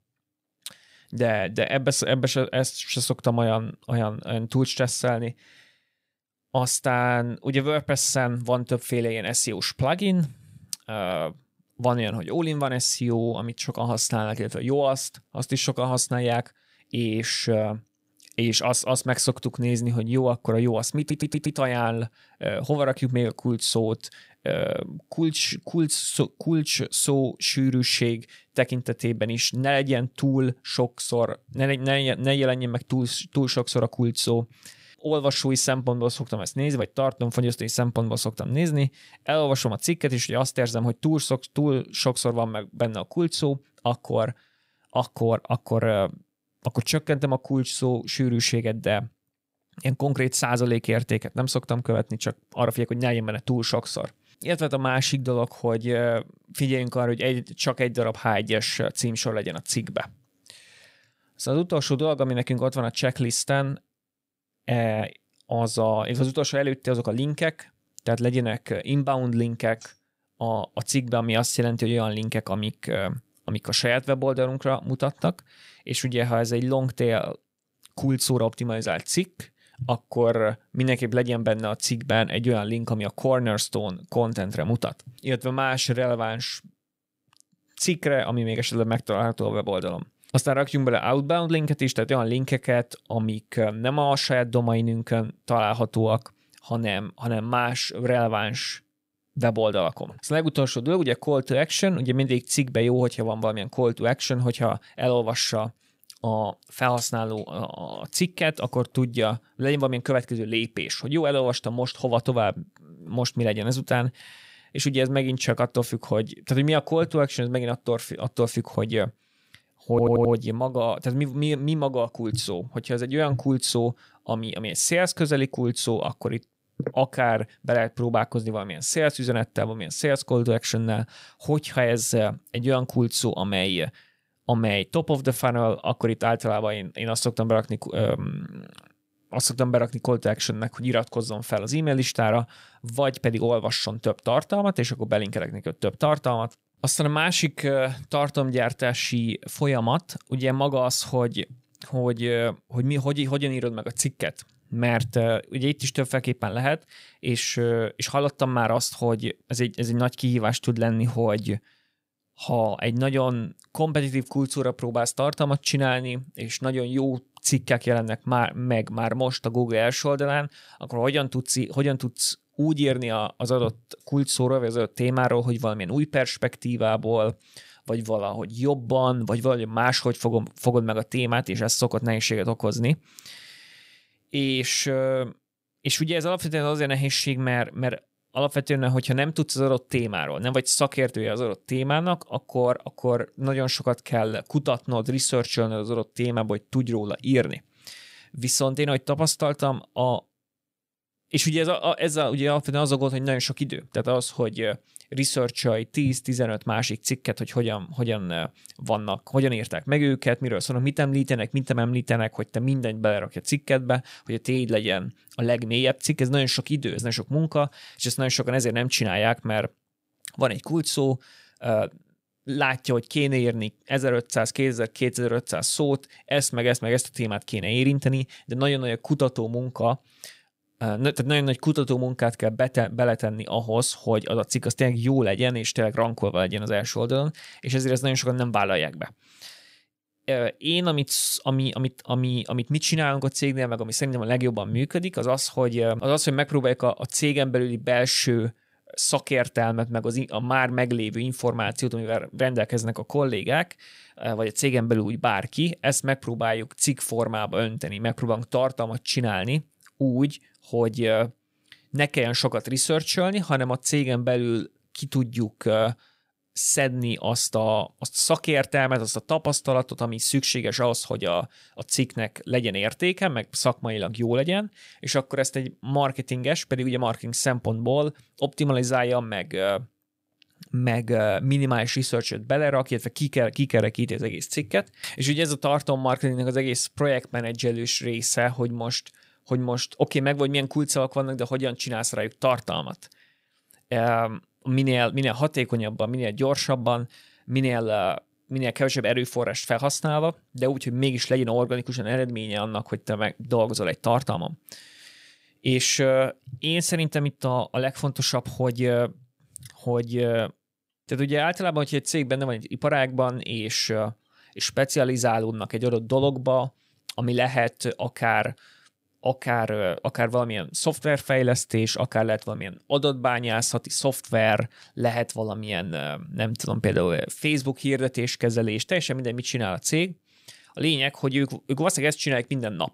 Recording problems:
audio stuttering; at 21 s and at 2:00

